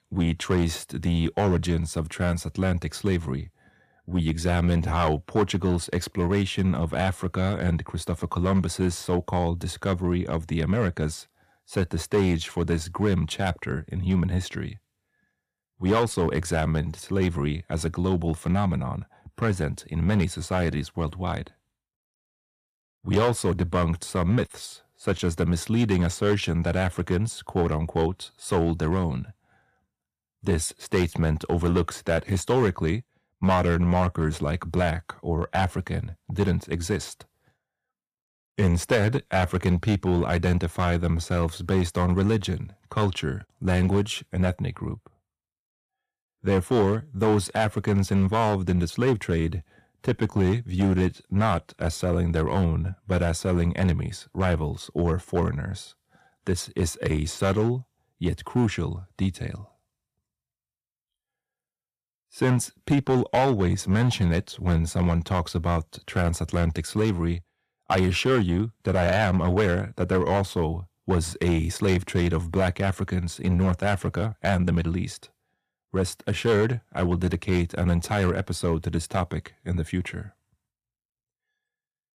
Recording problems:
distortion; slight; 4% of the sound clipped

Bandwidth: 14.5 kHz